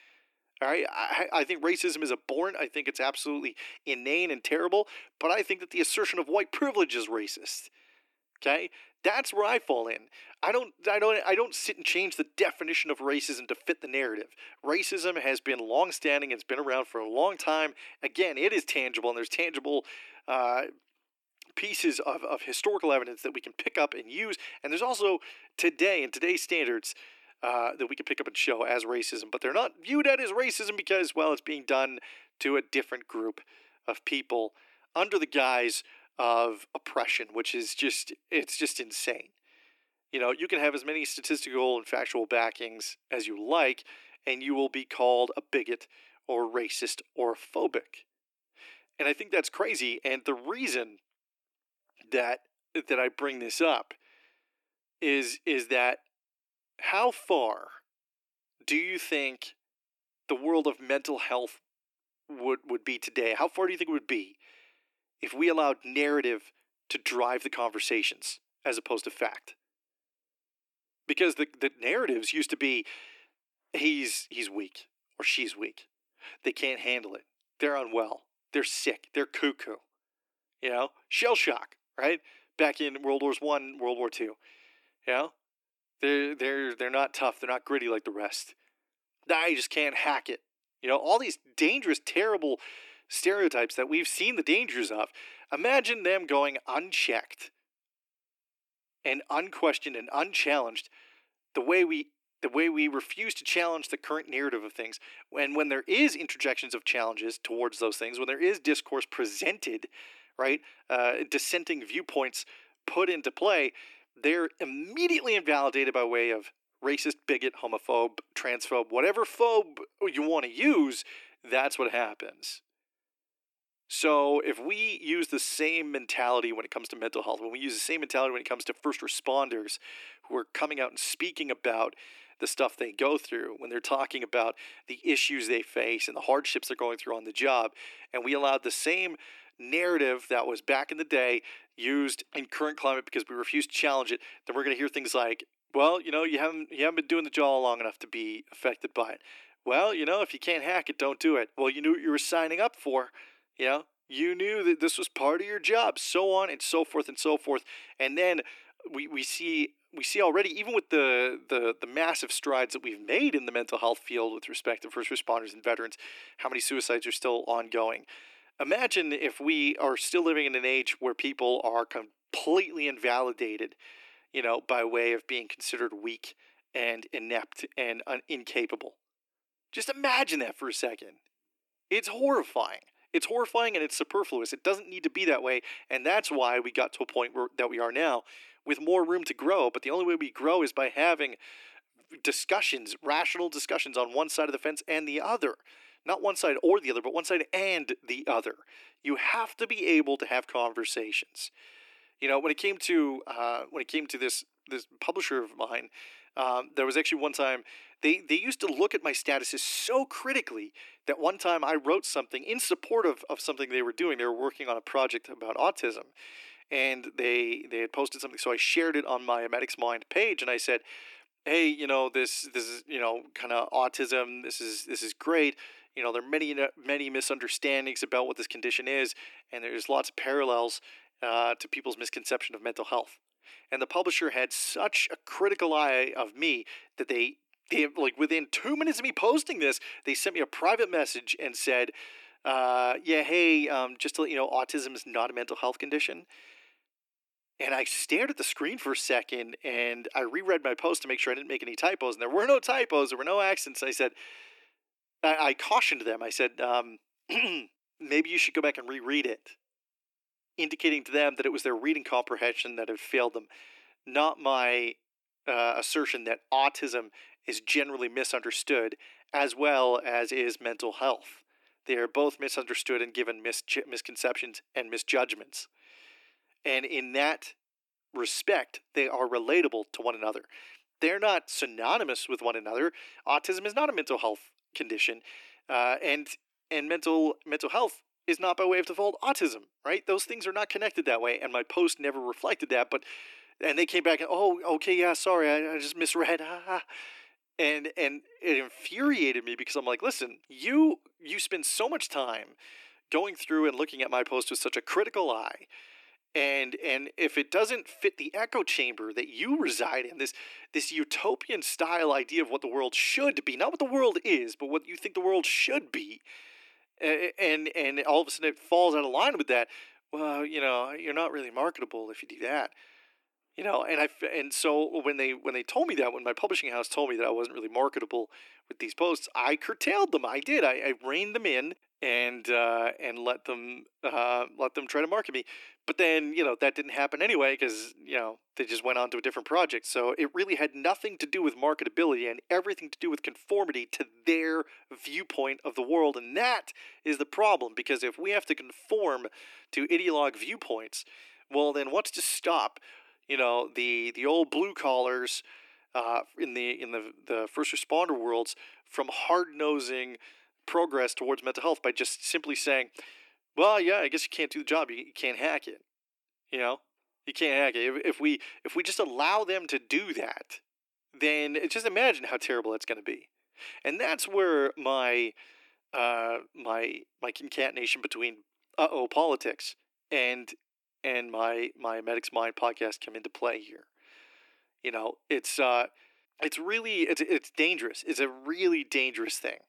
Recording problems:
thin; very; fading below 300 Hz

